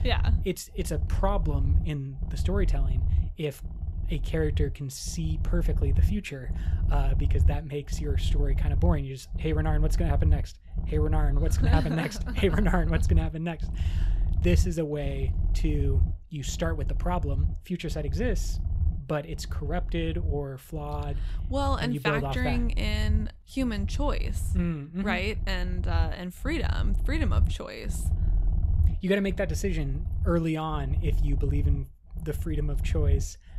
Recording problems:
low rumble; noticeable; throughout; 15 dB below the speech

